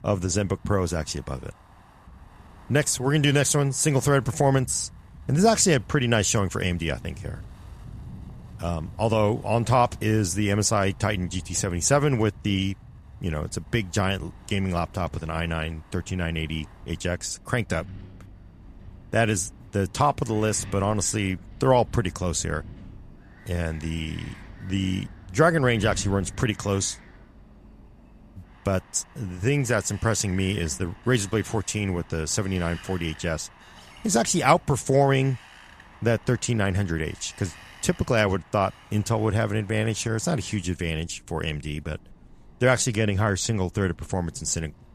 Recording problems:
wind in the background; faint; throughout; 20 dB below the speech

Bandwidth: 14.5 kHz